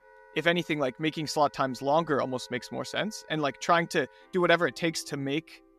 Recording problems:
background music; faint; throughout; 25 dB below the speech

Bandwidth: 14.5 kHz